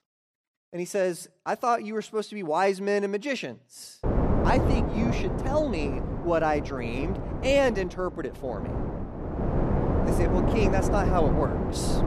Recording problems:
wind noise on the microphone; heavy; from 4 s on; 4 dB below the speech

